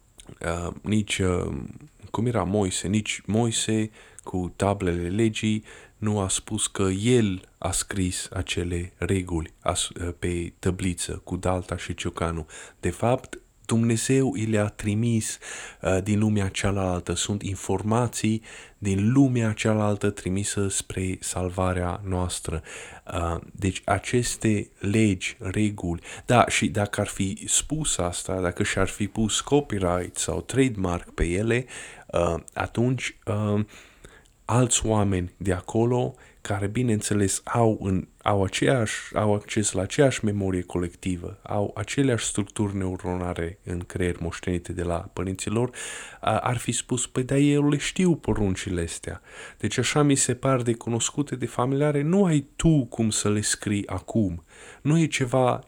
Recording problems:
none

